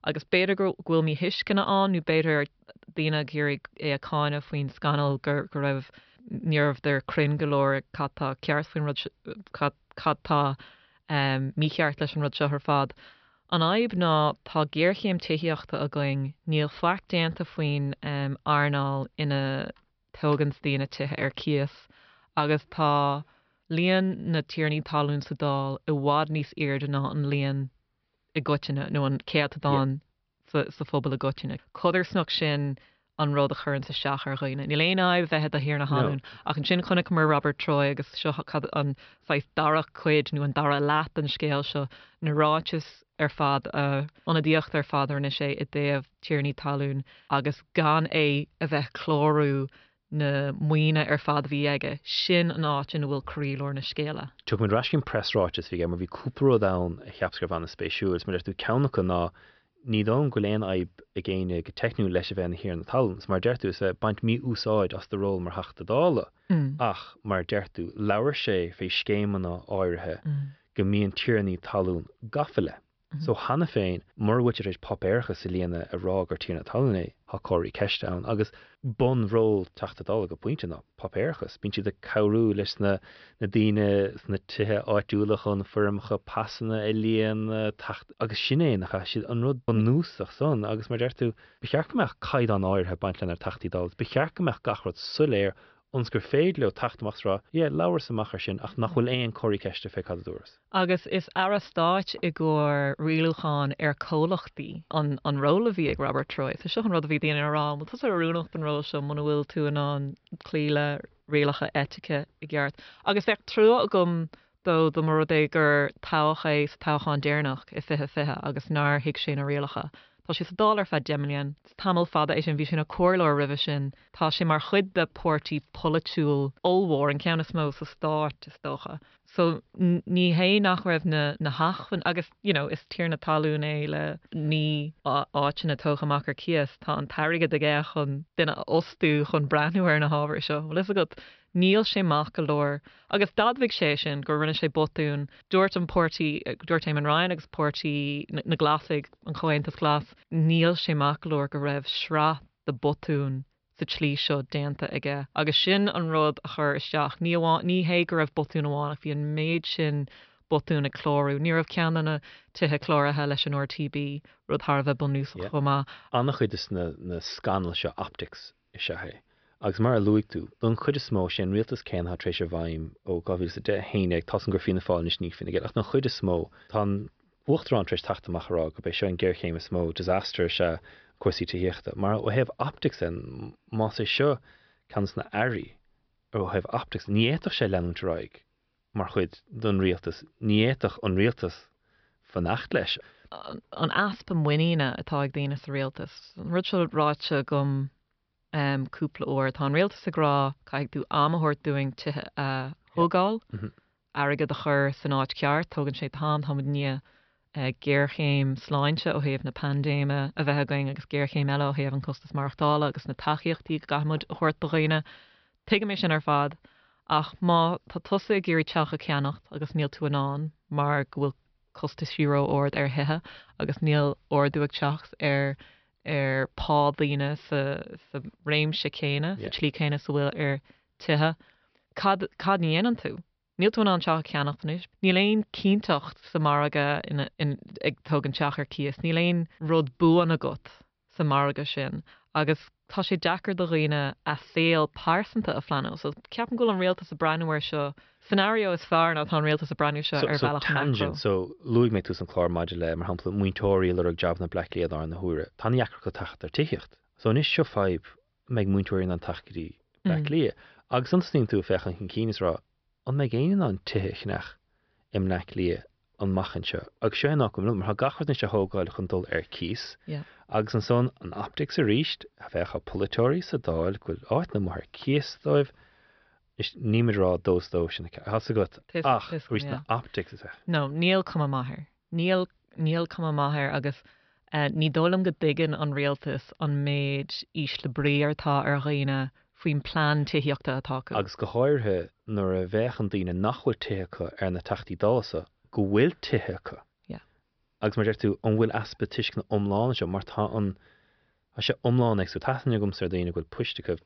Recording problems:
high frequencies cut off; noticeable; nothing above 5.5 kHz

